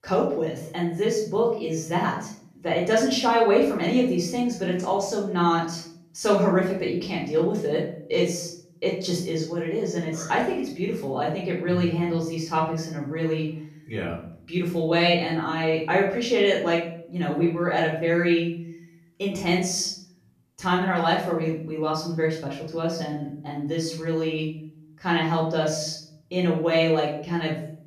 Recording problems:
off-mic speech; far
room echo; noticeable; dies away in 0.5 s

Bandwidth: 14.5 kHz